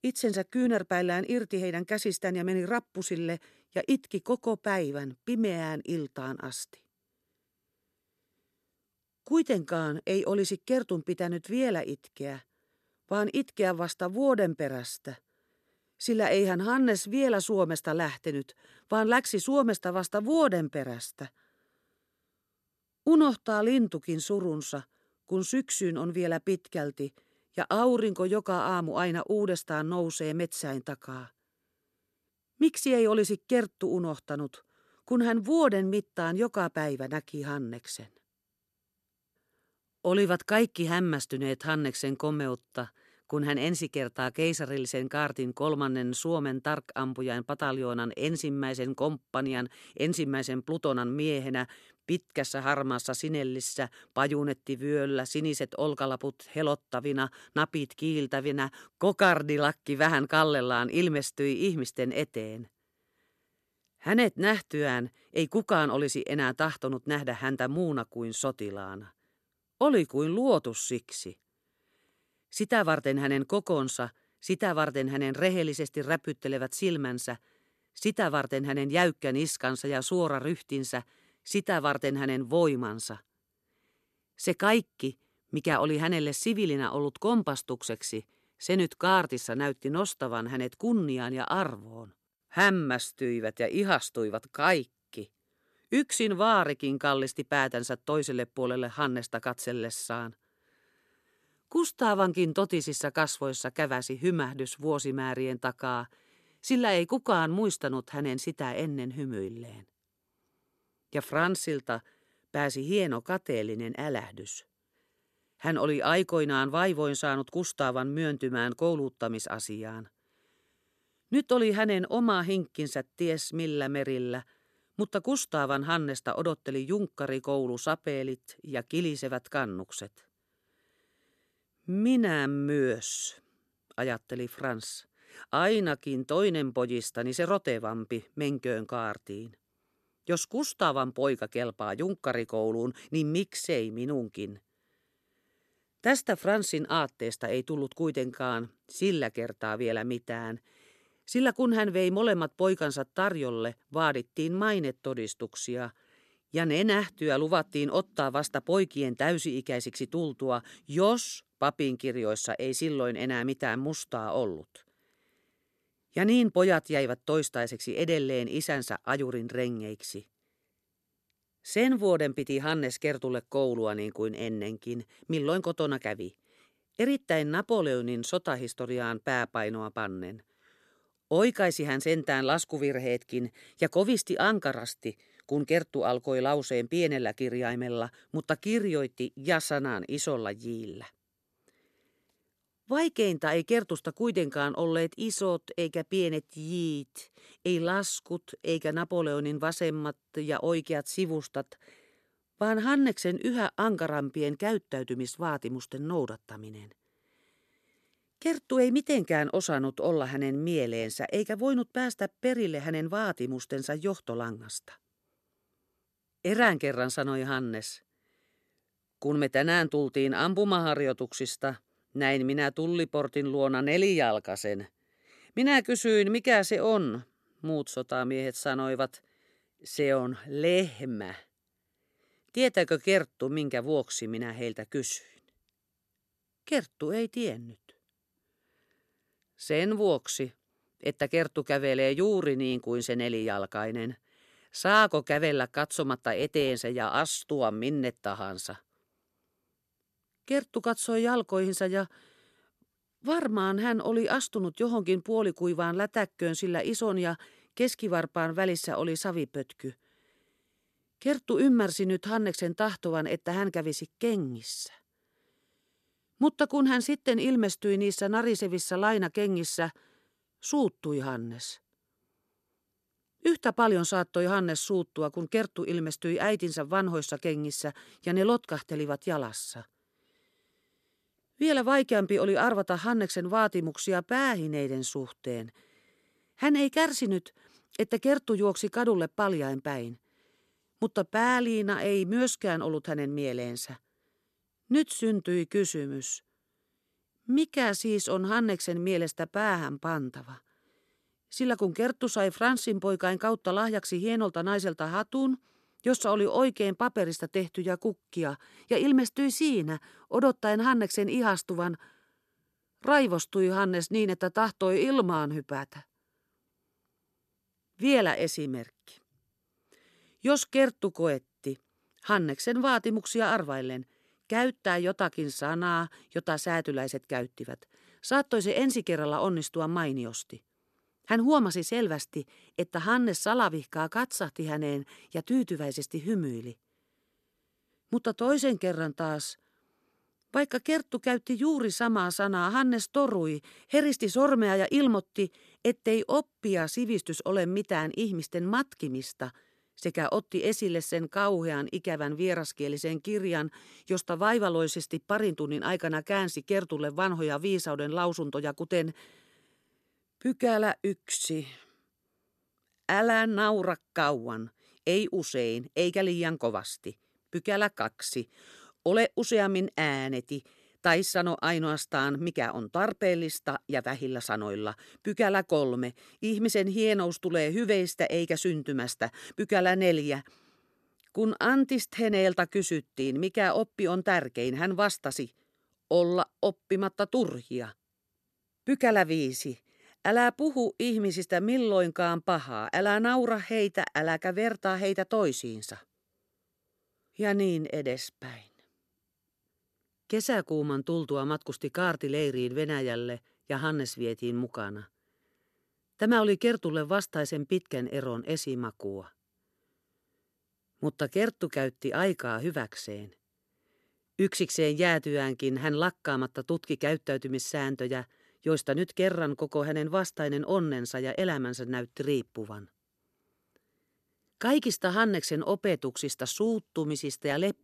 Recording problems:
none

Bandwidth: 13.5 kHz